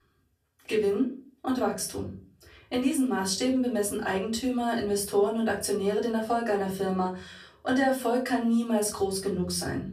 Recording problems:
off-mic speech; far
room echo; very slight; dies away in 0.4 s

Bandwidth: 14.5 kHz